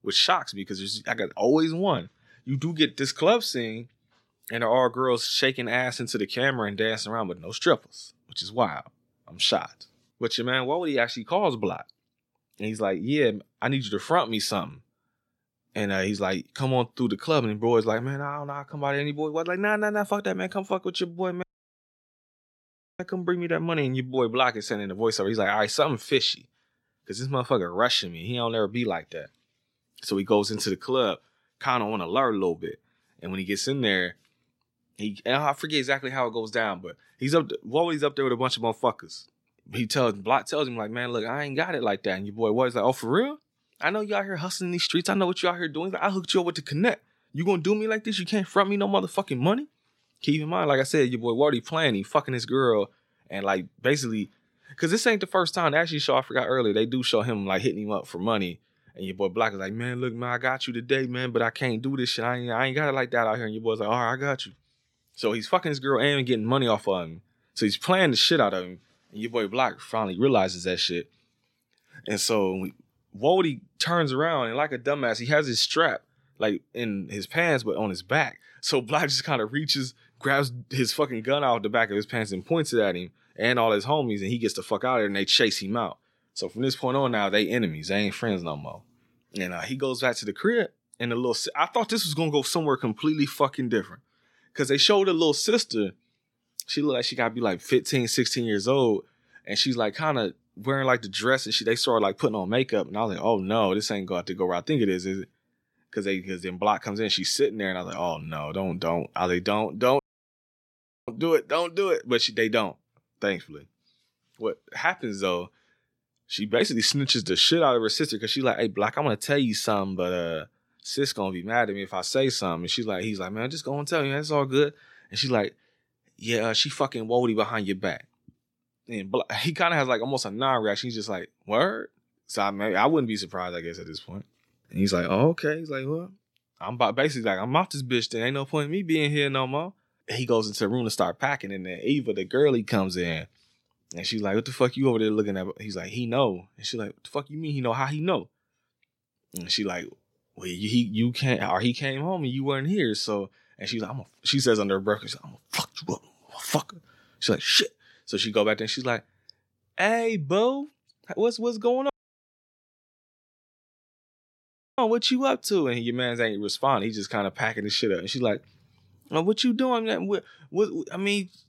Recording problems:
audio cutting out; at 21 s for 1.5 s, at 1:50 for 1 s and at 2:42 for 3 s

